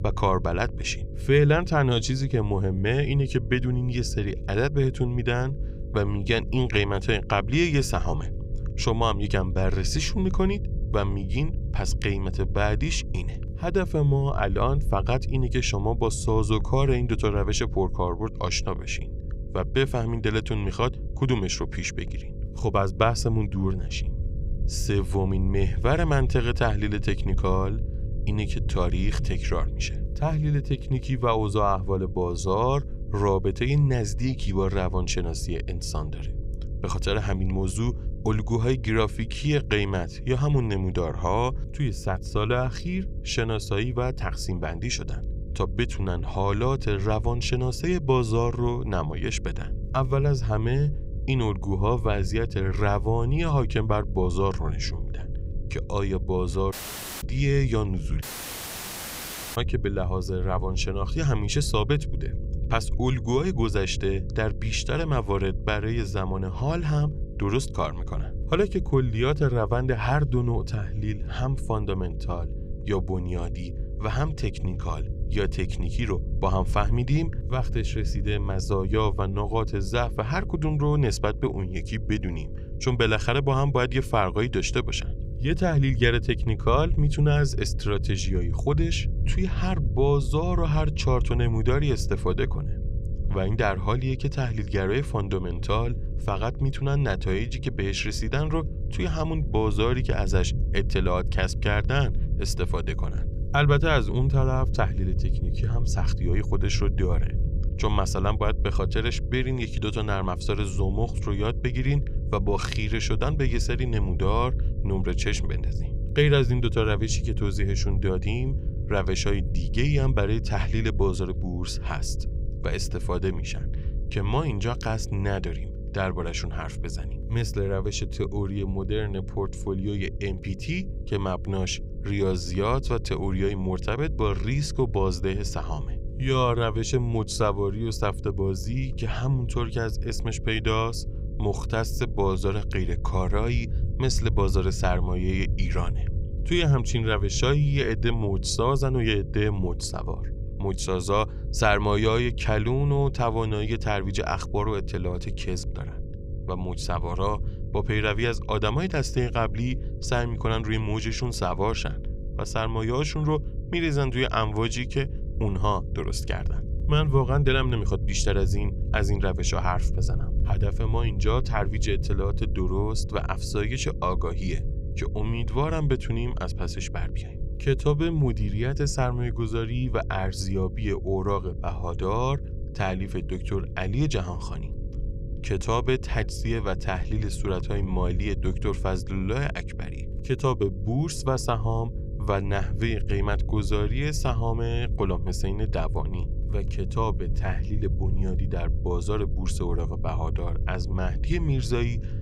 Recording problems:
electrical hum; noticeable; throughout; 50 Hz, 20 dB below the speech
low rumble; noticeable; throughout; 20 dB below the speech
audio cutting out; at 57 s for 0.5 s and at 58 s for 1.5 s

